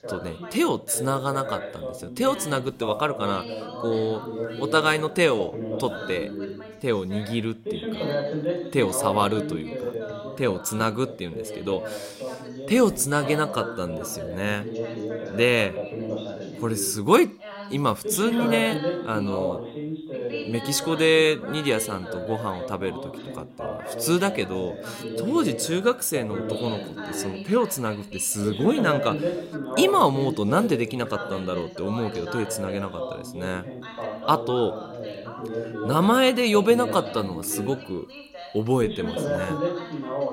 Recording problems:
background chatter; loud; throughout; 2 voices, 8 dB below the speech

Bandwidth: 16 kHz